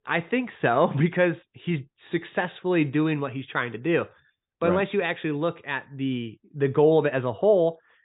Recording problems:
high frequencies cut off; severe; nothing above 4 kHz

